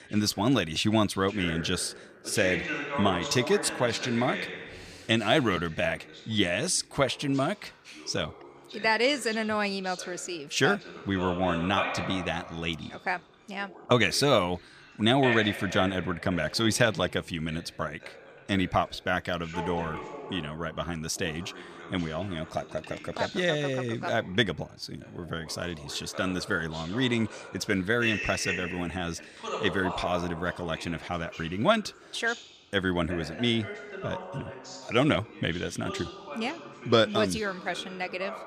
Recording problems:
voice in the background; loud; throughout; 9 dB below the speech

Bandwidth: 14.5 kHz